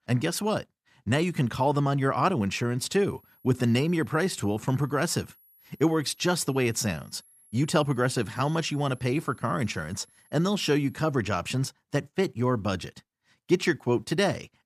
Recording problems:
high-pitched whine; faint; from 3 to 11 s; 11 kHz, 30 dB below the speech

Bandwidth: 14.5 kHz